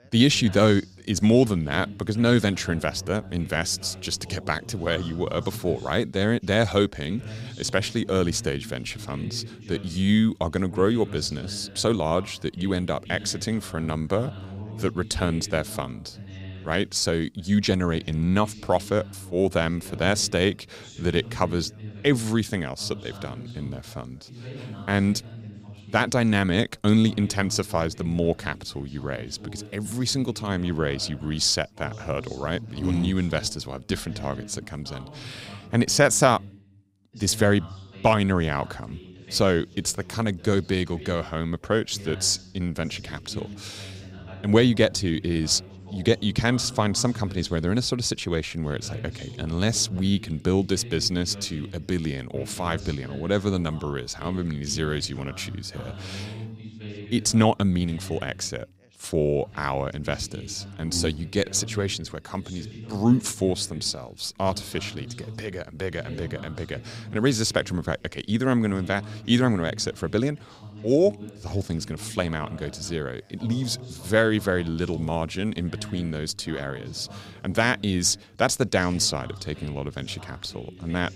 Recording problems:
background chatter; noticeable; throughout; 2 voices, 15 dB below the speech

